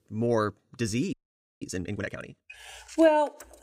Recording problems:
audio freezing; at 1 s

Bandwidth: 15.5 kHz